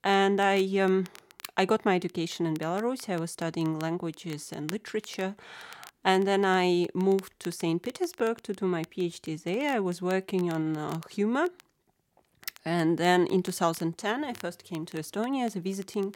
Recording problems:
crackle, like an old record; faint; 25 dB below the speech

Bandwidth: 16.5 kHz